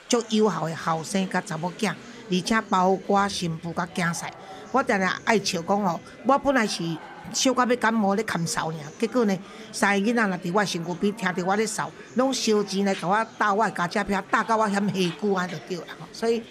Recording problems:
chatter from many people; noticeable; throughout; 20 dB below the speech

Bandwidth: 14.5 kHz